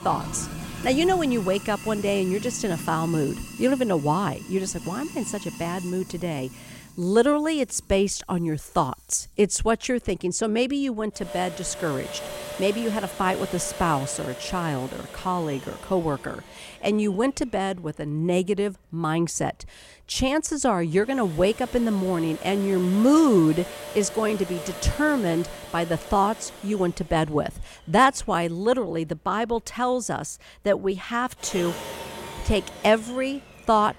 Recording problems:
household noises; noticeable; throughout; 15 dB below the speech

